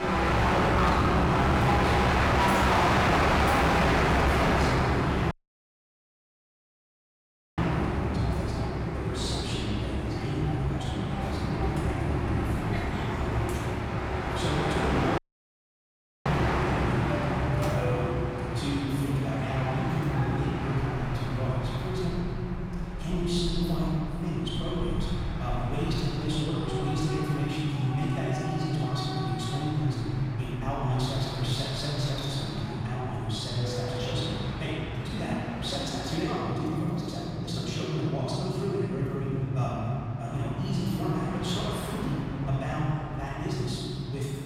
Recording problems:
room echo; strong; dies away in 3 s
off-mic speech; far
wrong speed, natural pitch; too fast; 1.5 times normal speed
distortion; slight; 5% of the sound clipped
train or aircraft noise; very loud; throughout; 1 dB above the speech
audio cutting out; at 5.5 s for 2.5 s and at 15 s for 1 s

